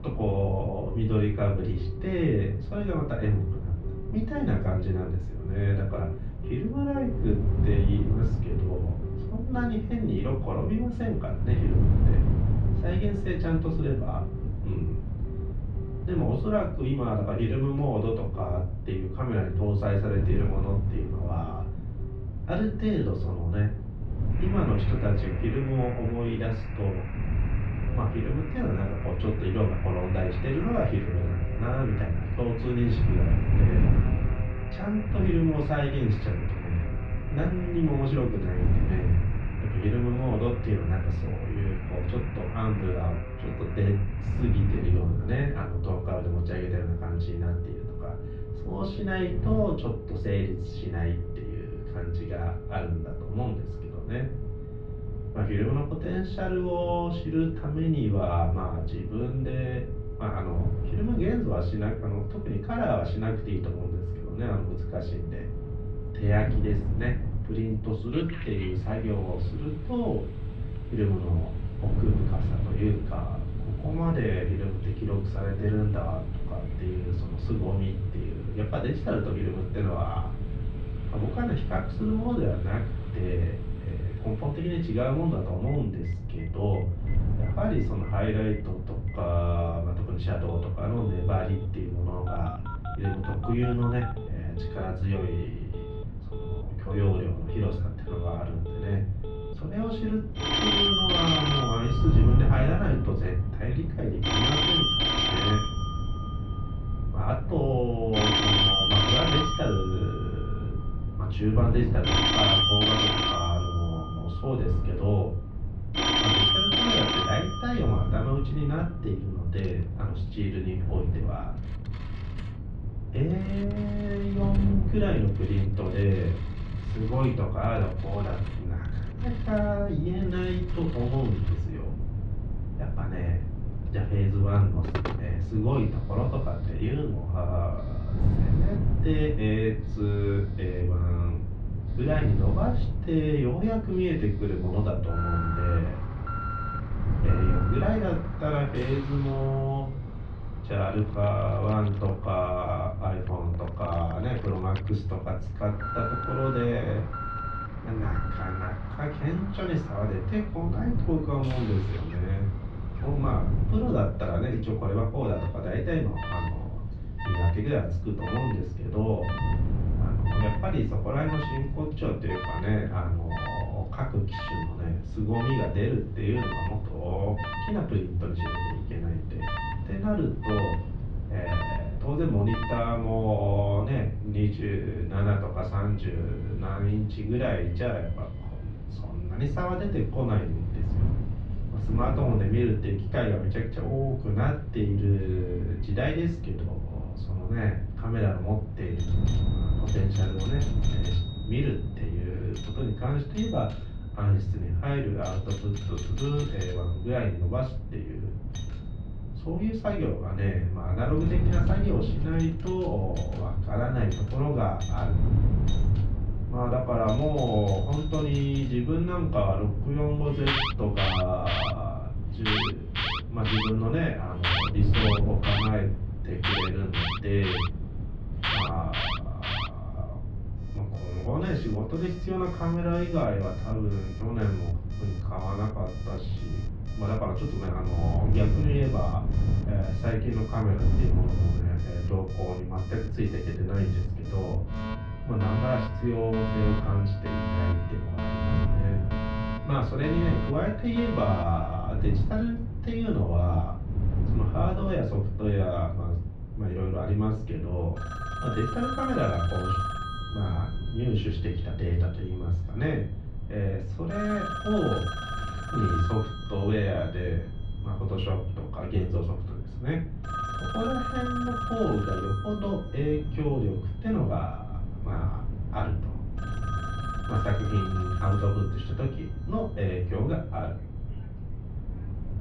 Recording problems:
off-mic speech; far
muffled; slightly; fading above 4 kHz
room echo; slight; dies away in 0.3 s
alarms or sirens; loud; throughout; 3 dB below the speech
wind noise on the microphone; occasional gusts; 10 dB below the speech

